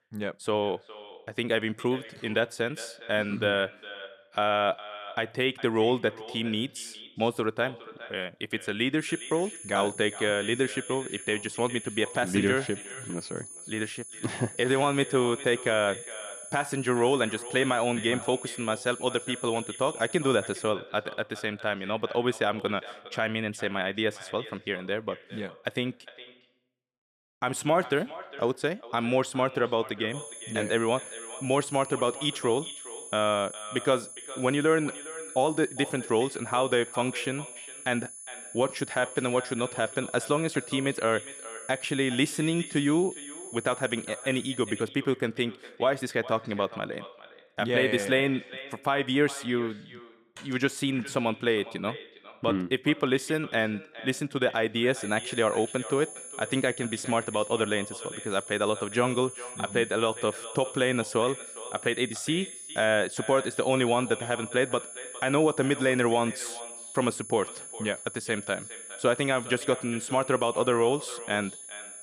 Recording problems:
echo of what is said; noticeable; throughout; 410 ms later, 15 dB below the speech
high-pitched whine; noticeable; from 9 to 21 s, from 30 to 45 s and from 55 s on; 10 kHz, 10 dB below the speech

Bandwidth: 14.5 kHz